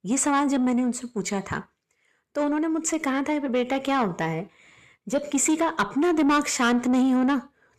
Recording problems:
distortion; slight; 10 dB below the speech

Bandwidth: 13.5 kHz